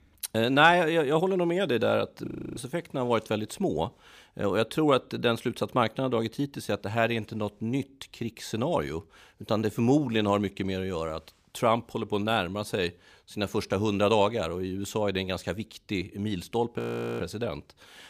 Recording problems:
audio freezing; at 2.5 s and at 17 s

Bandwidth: 15 kHz